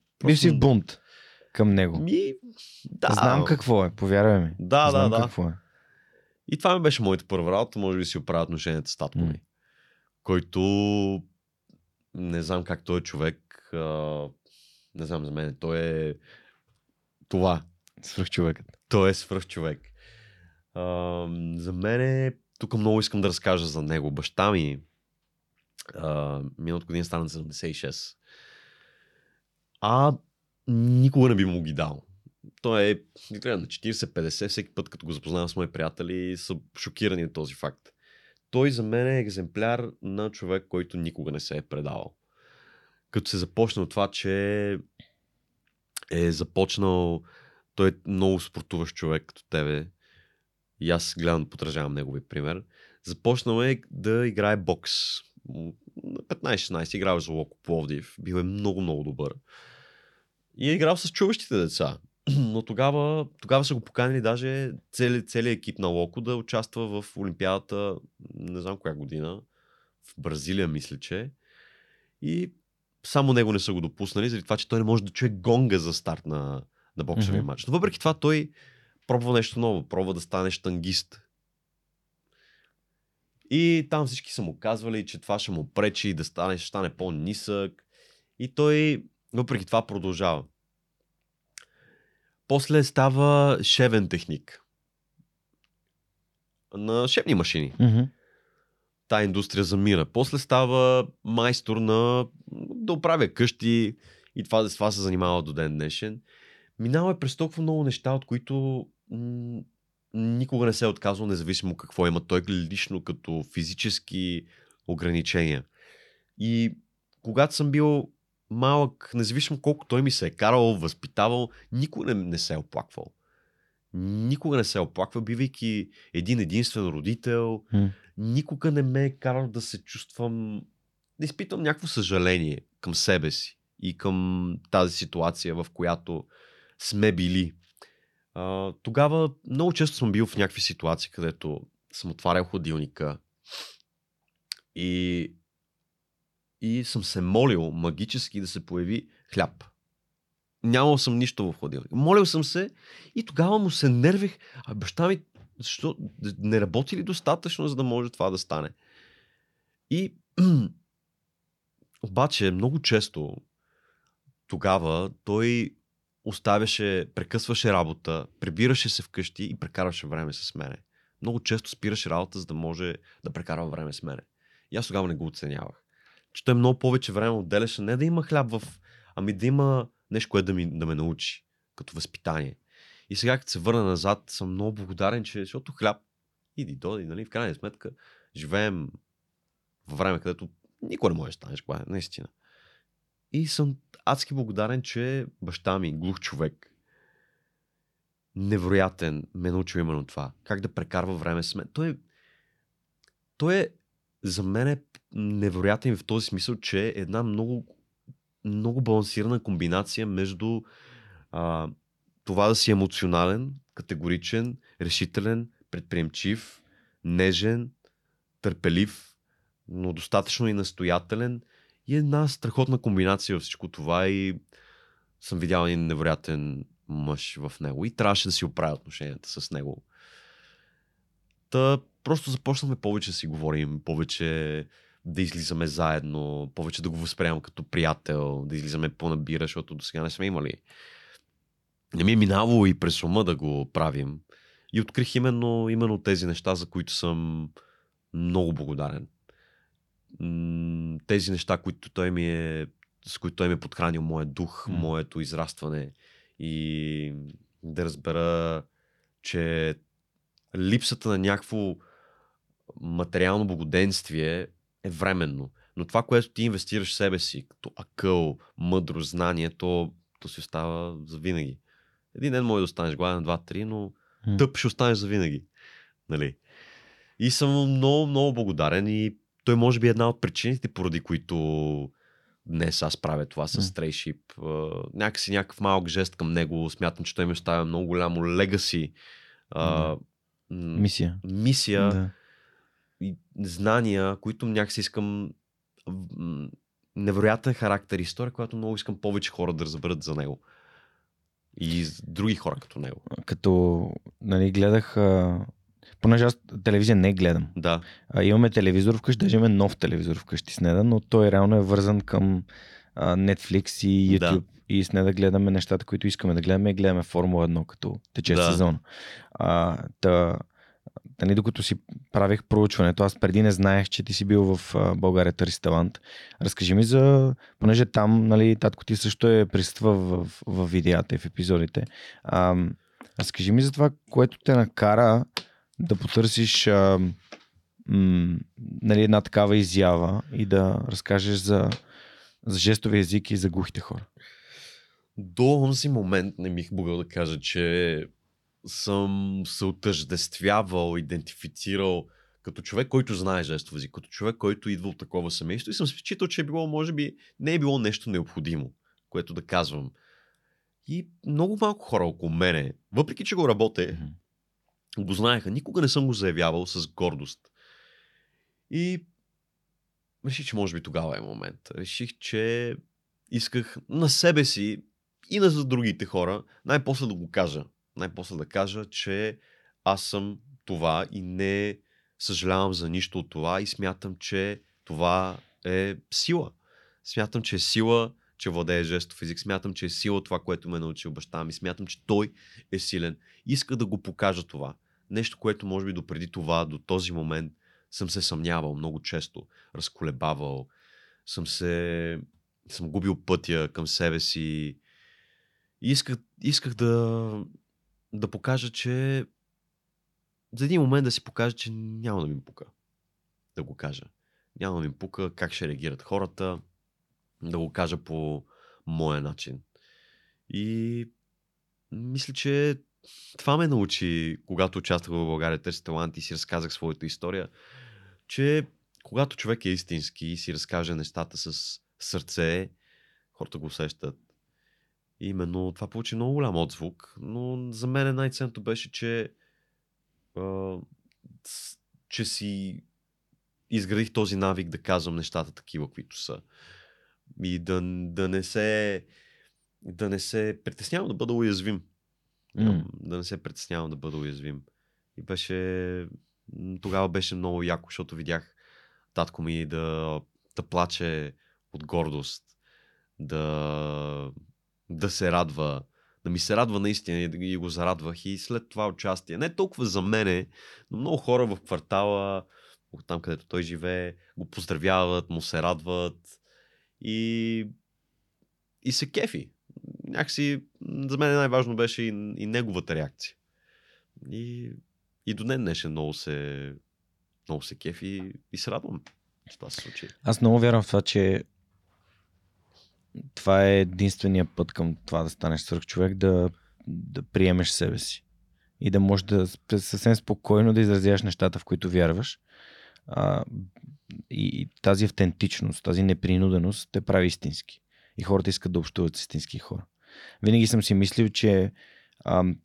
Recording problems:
none

